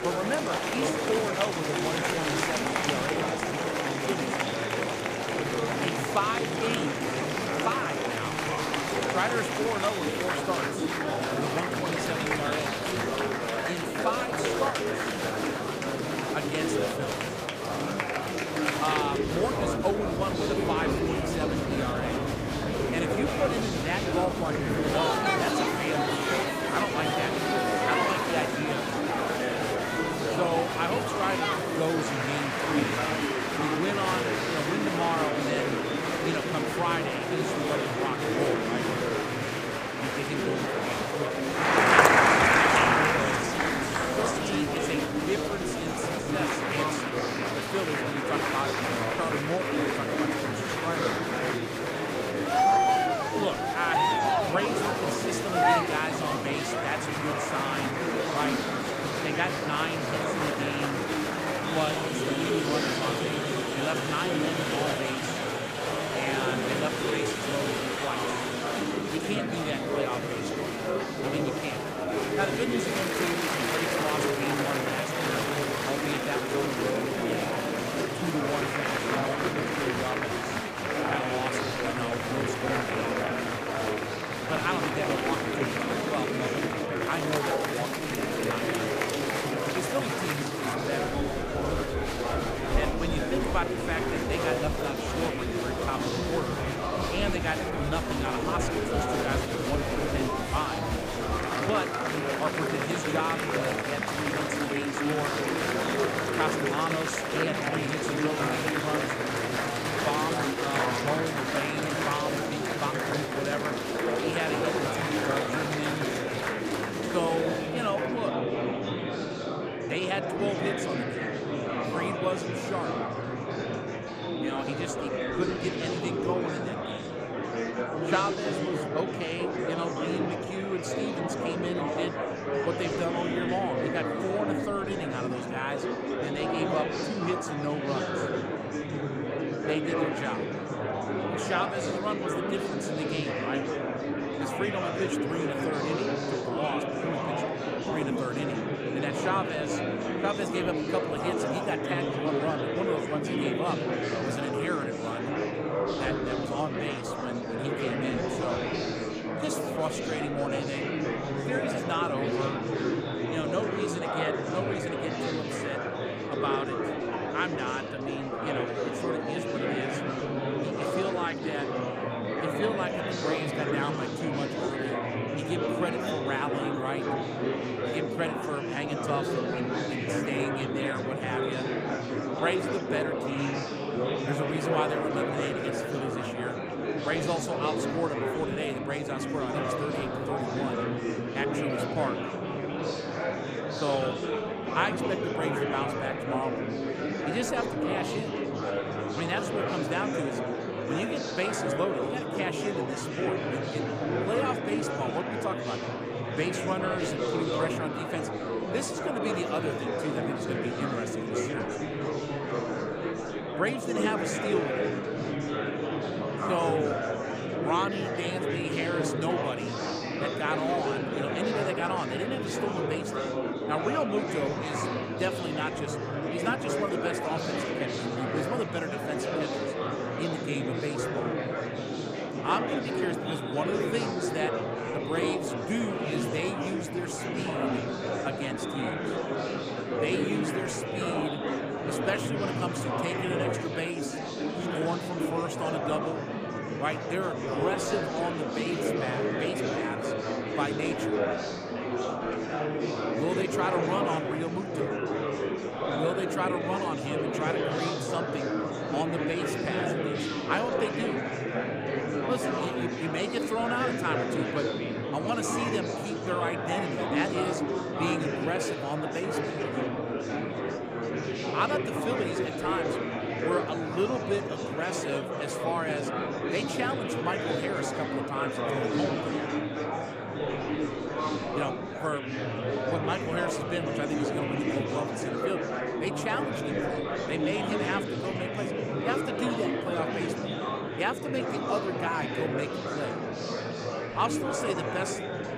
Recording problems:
murmuring crowd; very loud; throughout; 4 dB above the speech

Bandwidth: 15 kHz